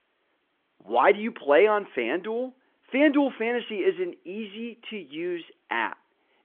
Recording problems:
phone-call audio

